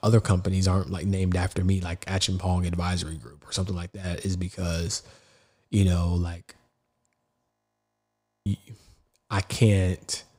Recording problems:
audio freezing; at 7.5 s for 1 s

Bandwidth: 15.5 kHz